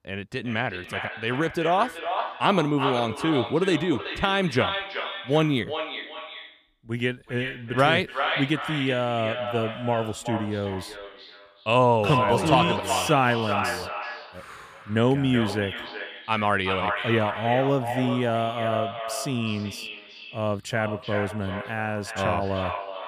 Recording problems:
echo of what is said; strong; throughout; 380 ms later, 6 dB below the speech

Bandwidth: 15 kHz